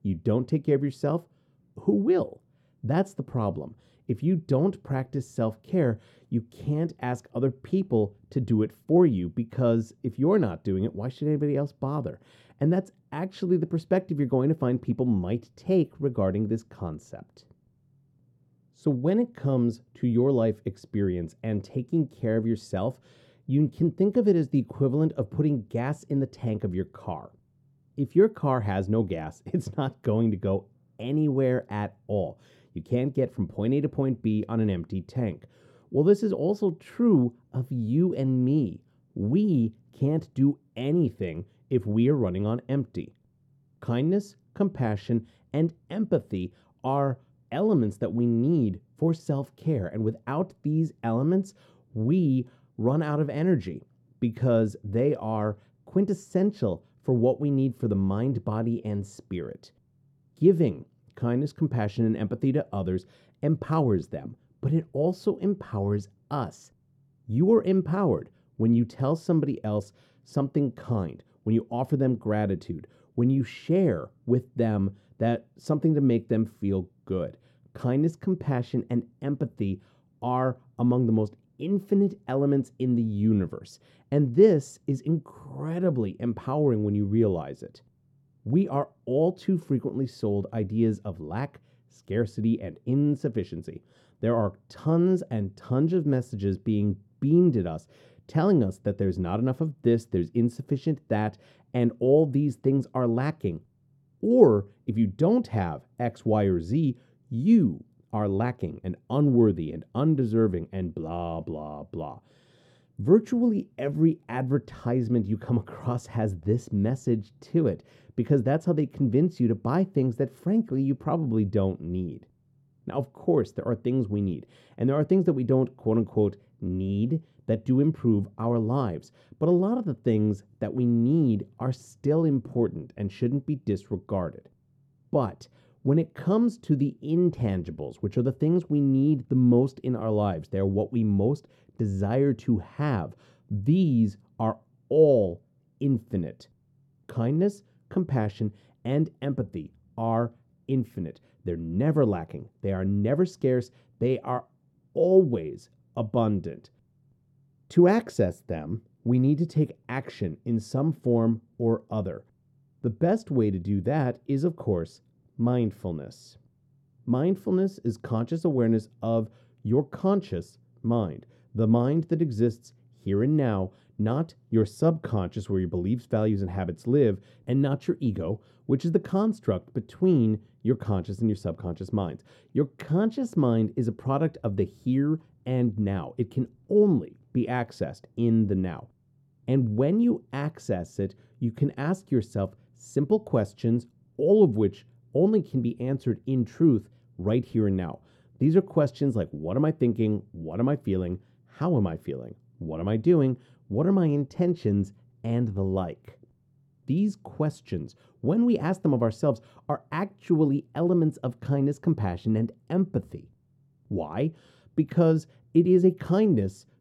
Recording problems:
muffled; very; fading above 1 kHz

